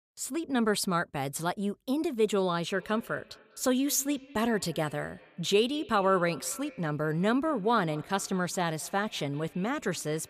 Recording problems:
echo of what is said; faint; from 2.5 s on; 200 ms later, 20 dB below the speech

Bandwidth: 15 kHz